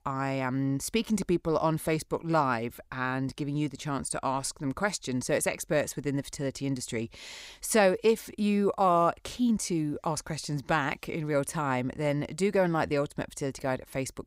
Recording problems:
none

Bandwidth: 15.5 kHz